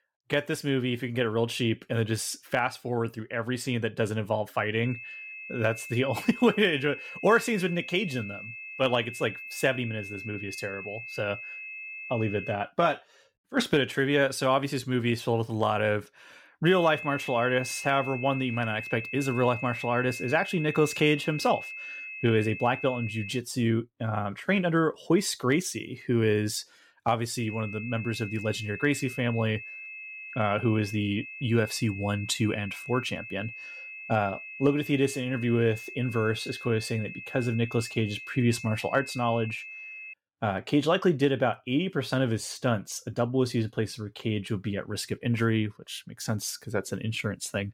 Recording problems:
high-pitched whine; noticeable; from 5 to 13 s, from 17 to 23 s and from 27 to 40 s; 2.5 kHz, 10 dB below the speech

